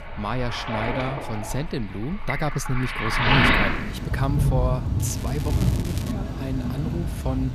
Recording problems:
rain or running water; very loud; throughout; 4 dB above the speech
crackling; noticeable; from 5 to 6 s; 10 dB below the speech

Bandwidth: 14 kHz